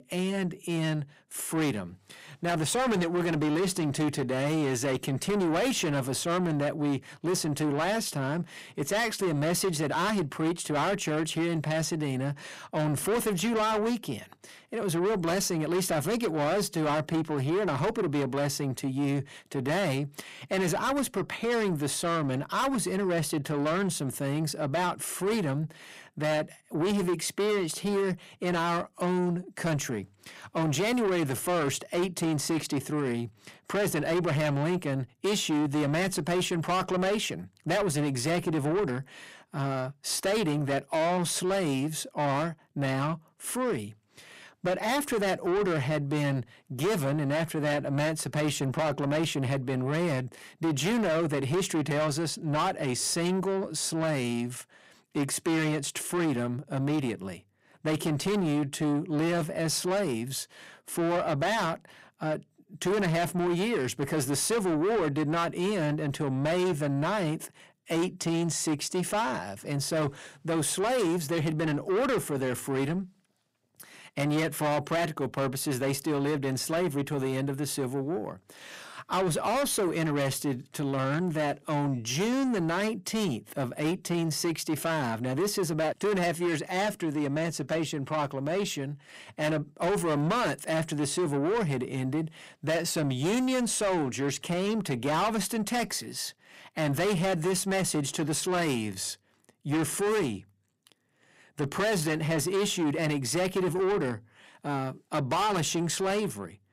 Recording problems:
distortion; heavy; 7 dB below the speech

